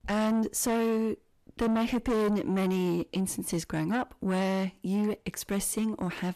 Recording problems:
distortion; heavy; 7 dB below the speech

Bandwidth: 14 kHz